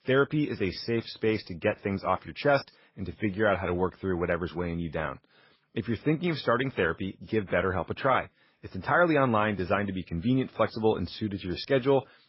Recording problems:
garbled, watery; badly; nothing above 5.5 kHz

